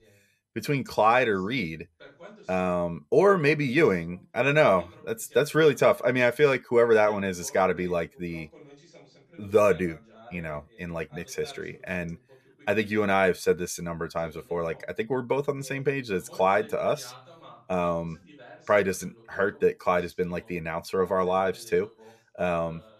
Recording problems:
voice in the background; faint; throughout; 25 dB below the speech

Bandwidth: 14.5 kHz